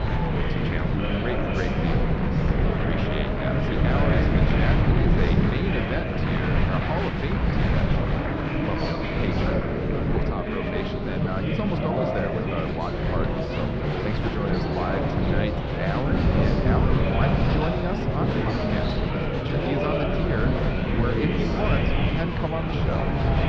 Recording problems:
muffled; very slightly; fading above 4 kHz
murmuring crowd; very loud; throughout; 4 dB above the speech
wind noise on the microphone; heavy; 2 dB below the speech

